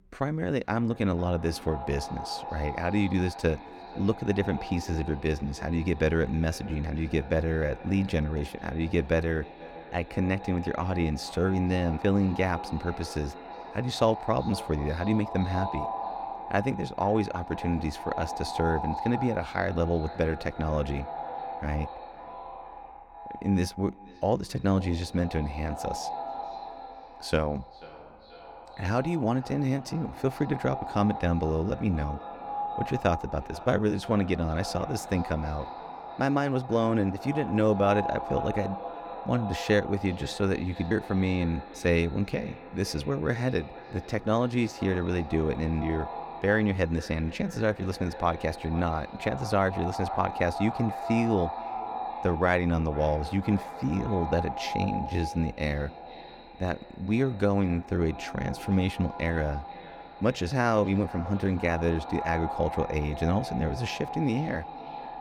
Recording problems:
echo of what is said; strong; throughout; 480 ms later, 10 dB below the speech

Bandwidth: 17.5 kHz